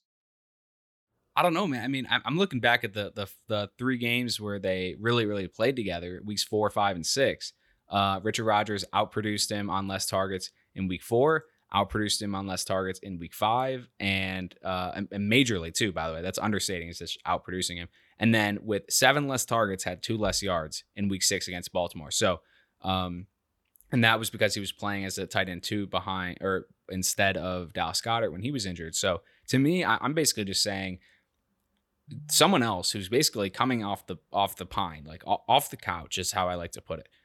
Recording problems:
none

